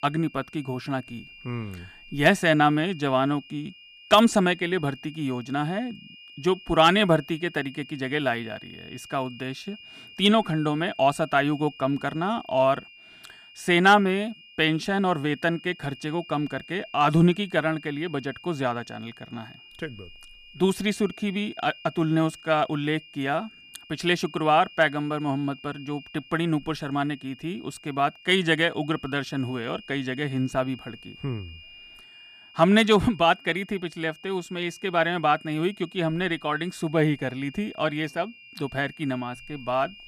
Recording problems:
high-pitched whine; faint; throughout; 3 kHz, 20 dB below the speech

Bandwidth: 15 kHz